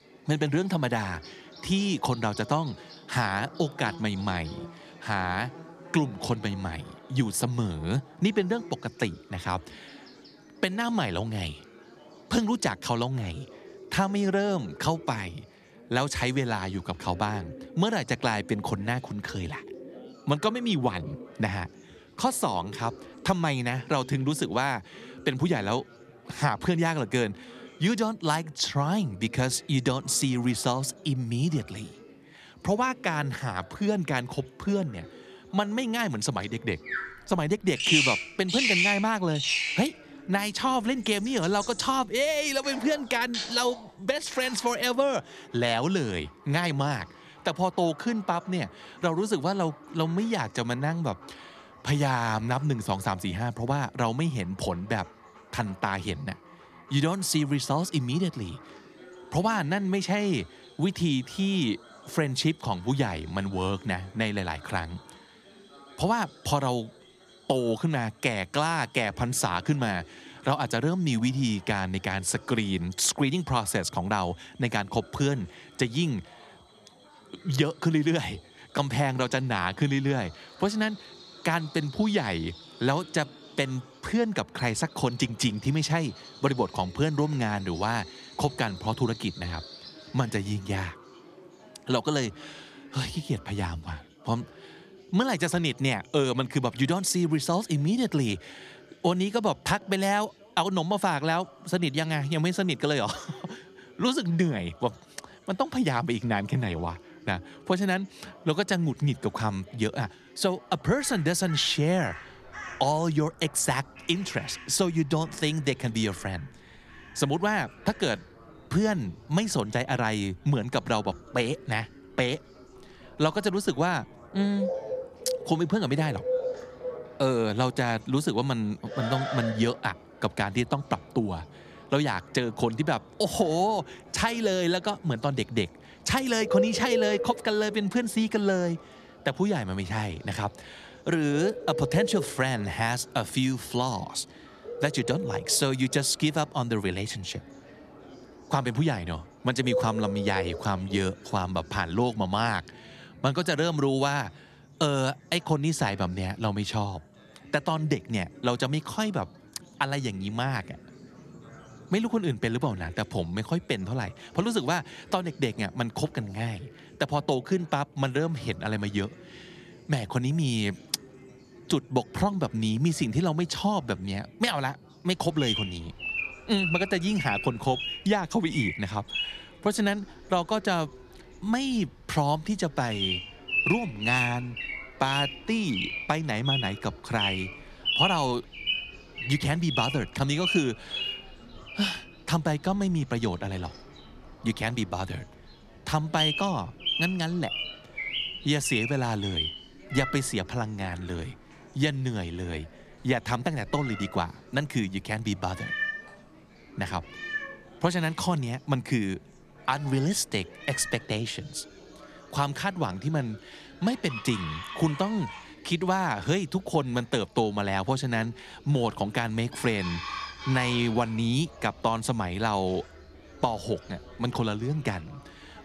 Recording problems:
animal sounds; loud; throughout; 5 dB below the speech
background chatter; faint; throughout; 4 voices, 25 dB below the speech

